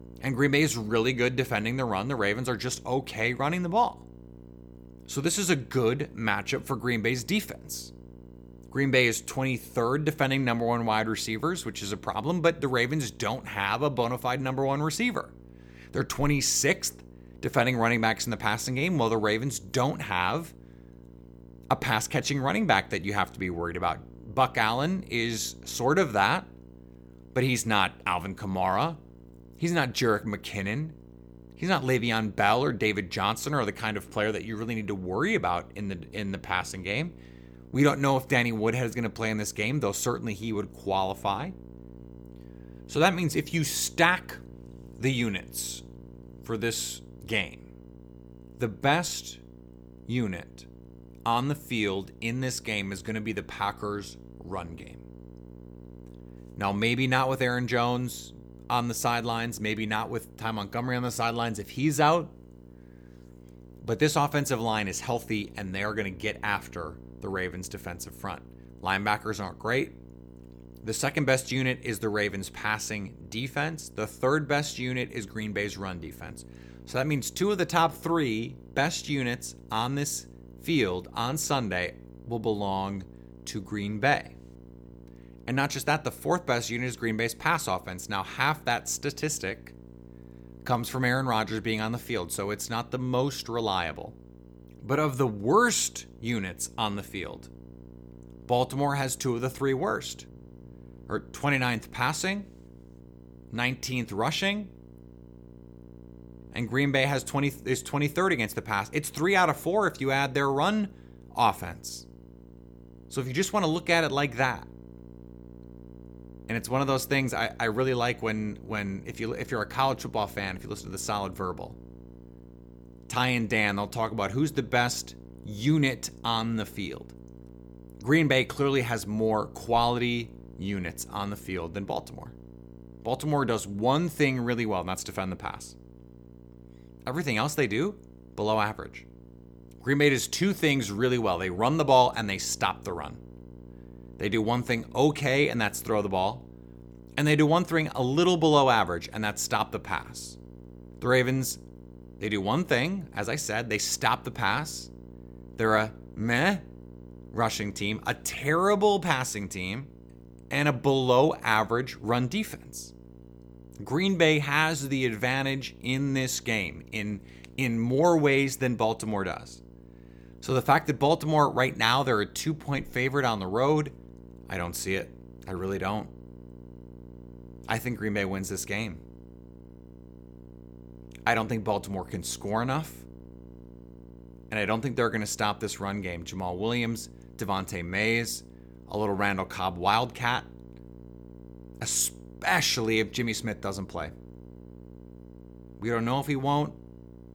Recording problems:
electrical hum; faint; throughout; 60 Hz, 25 dB below the speech

